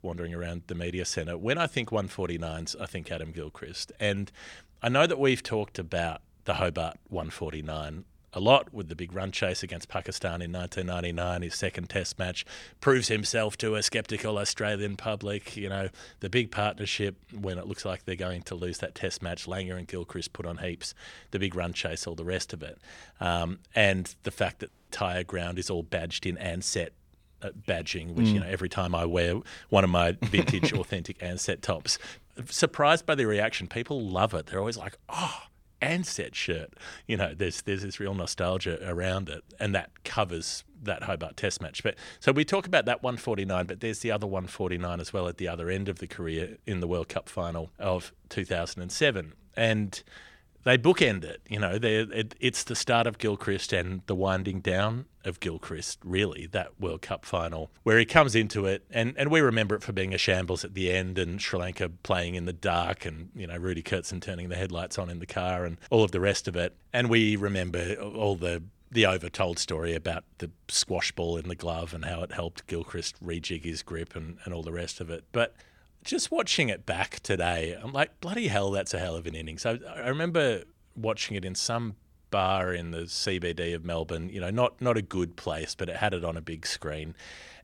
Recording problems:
audio cutting out; at 25 s

